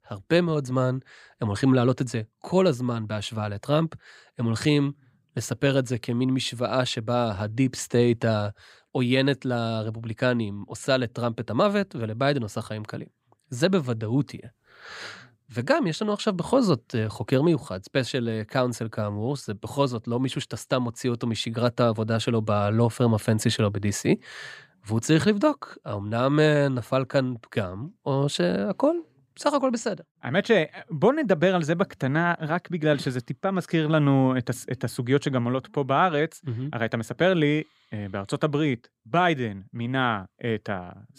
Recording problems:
none

